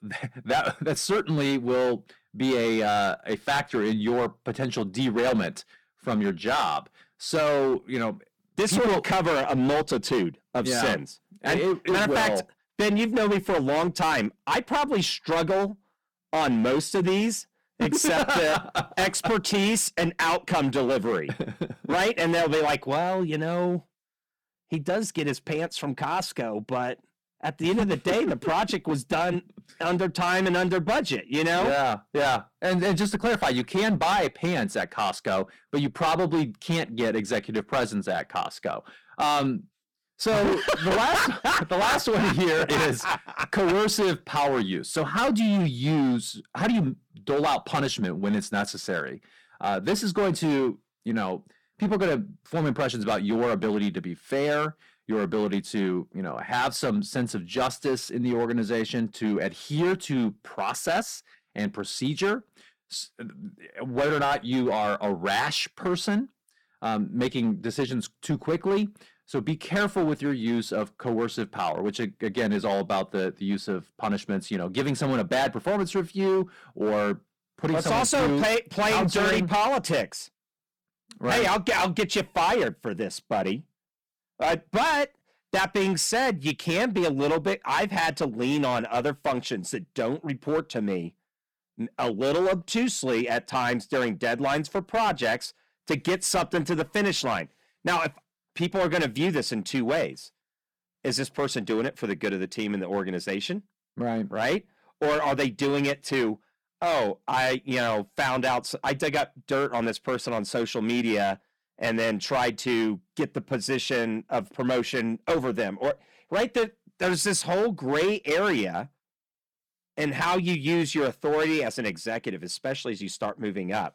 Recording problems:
distortion; heavy; 12% of the sound clipped

